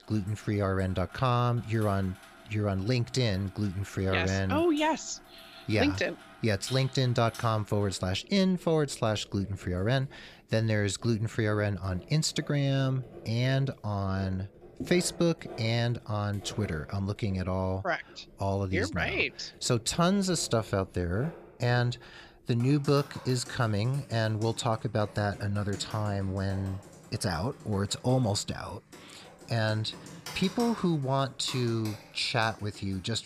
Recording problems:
household noises; noticeable; throughout; 20 dB below the speech

